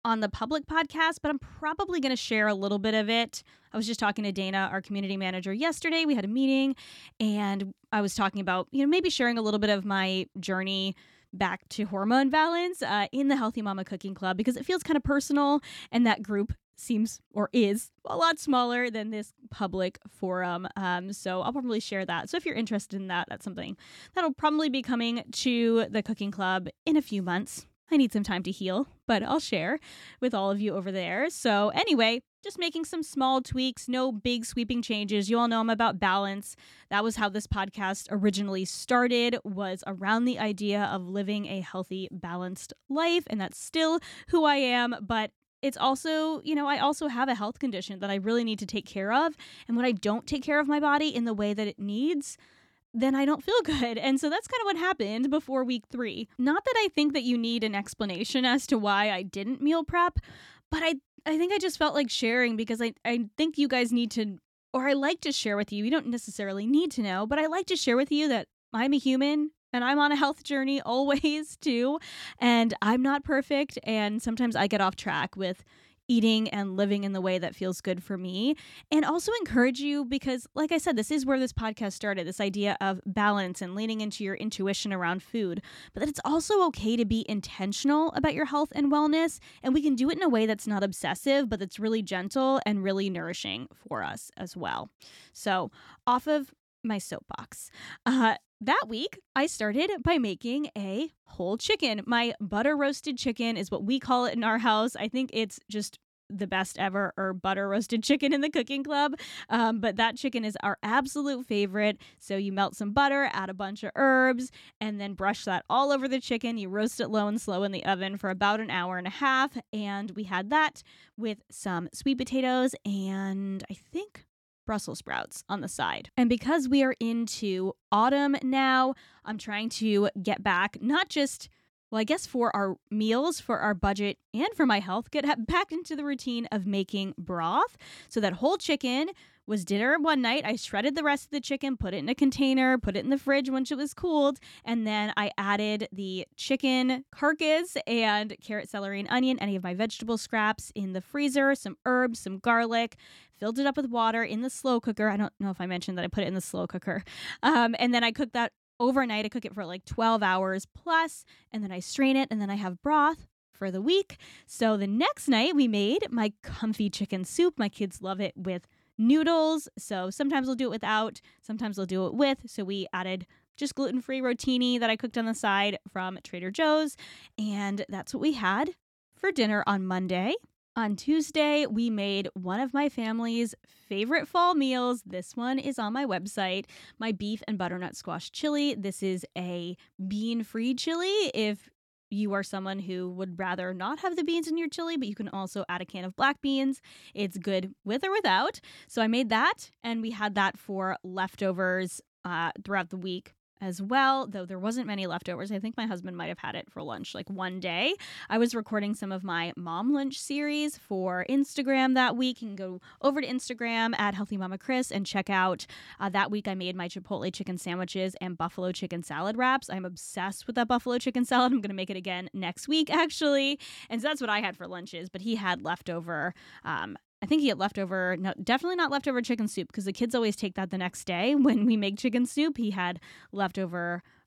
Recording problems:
none

